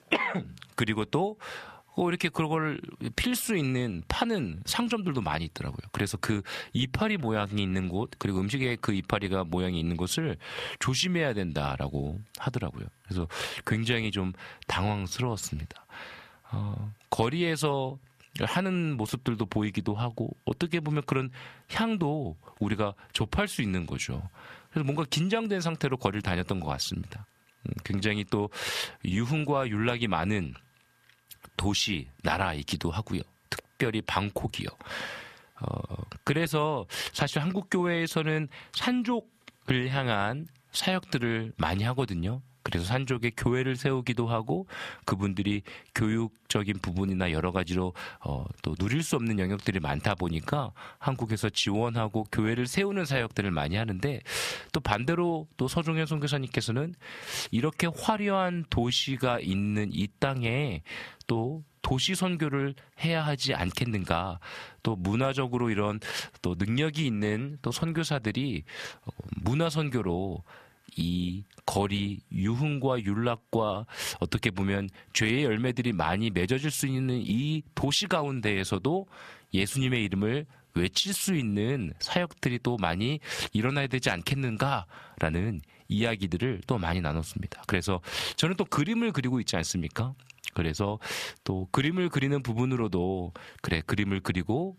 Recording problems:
squashed, flat; heavily

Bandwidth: 14.5 kHz